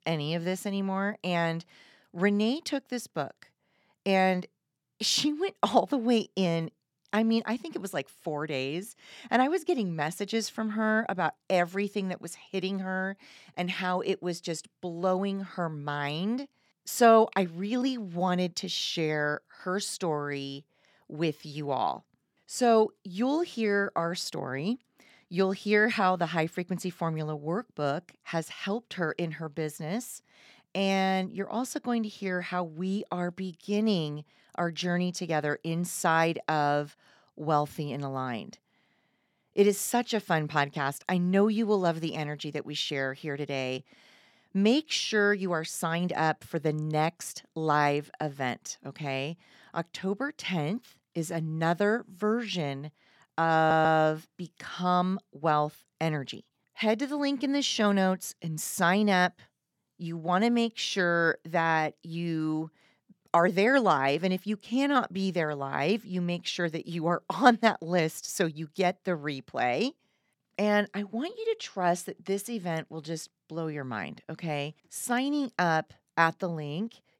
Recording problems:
audio stuttering; at 54 s

